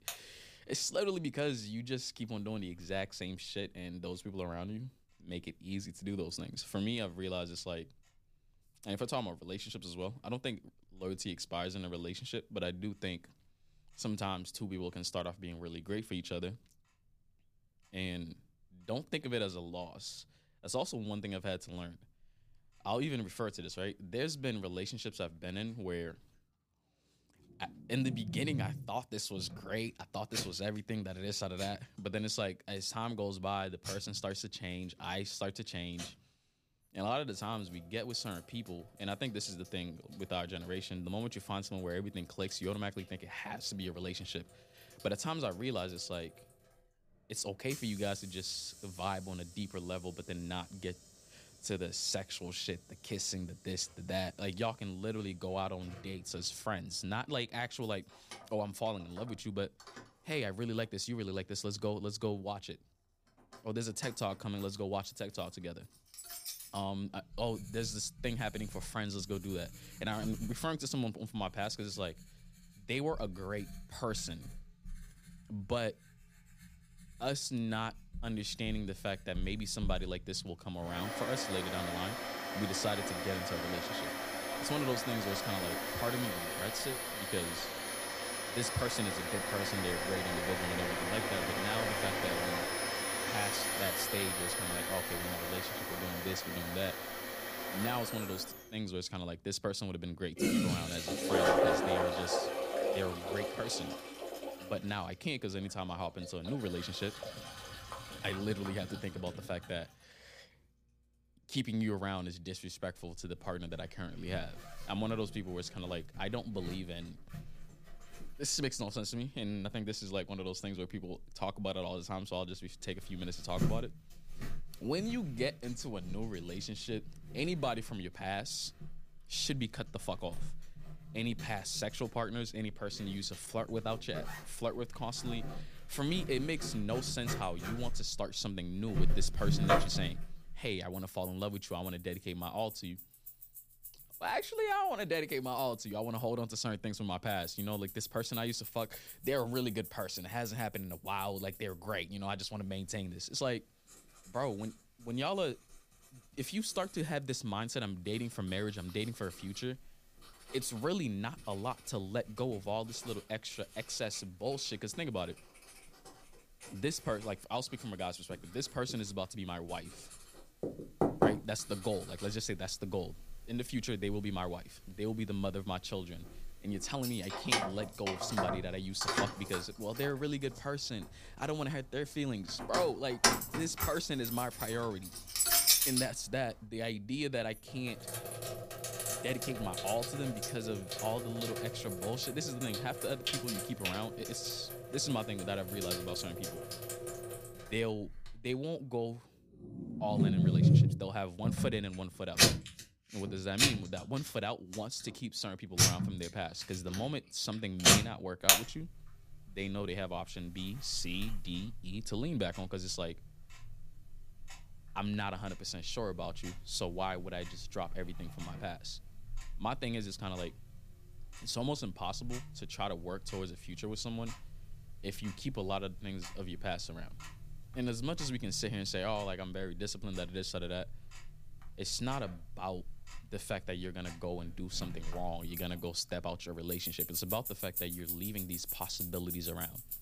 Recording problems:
household noises; very loud; throughout; 3 dB above the speech

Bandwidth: 15 kHz